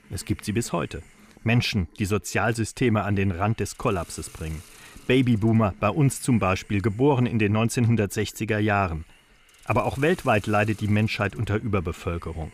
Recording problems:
hiss; faint; throughout; 25 dB below the speech

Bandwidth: 15 kHz